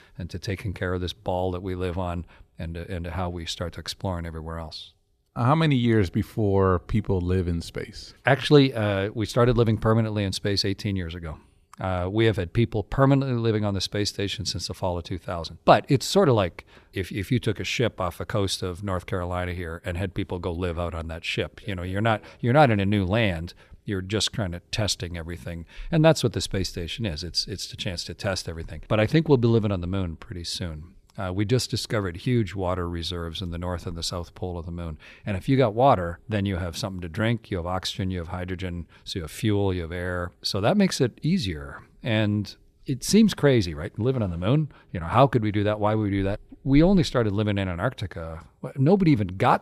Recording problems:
none

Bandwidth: 14.5 kHz